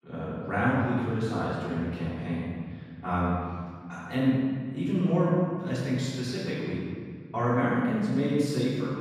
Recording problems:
room echo; strong; dies away in 2.1 s
off-mic speech; far

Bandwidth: 14.5 kHz